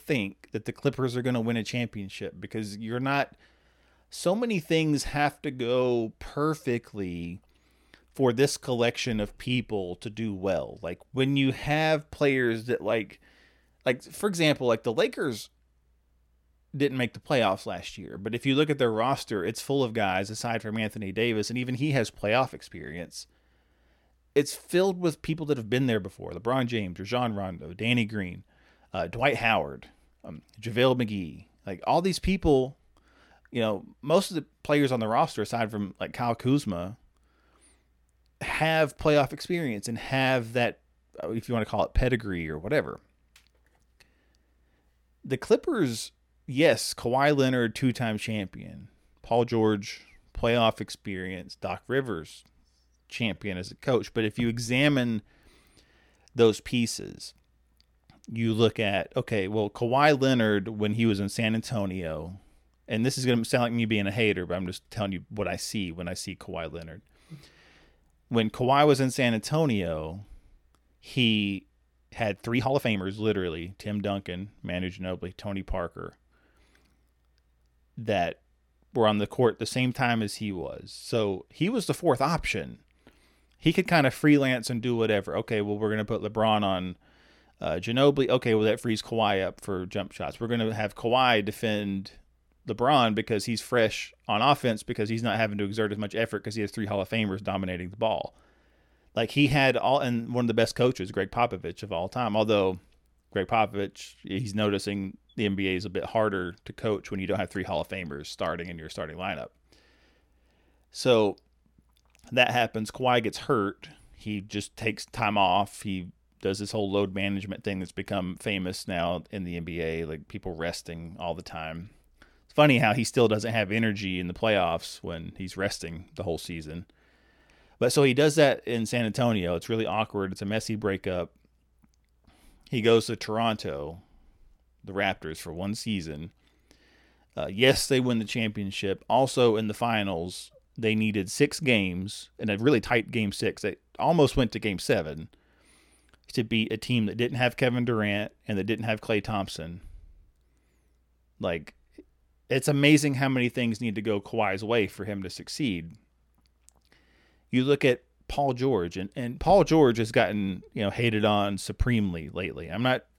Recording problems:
uneven, jittery; strongly; from 11 s to 2:23

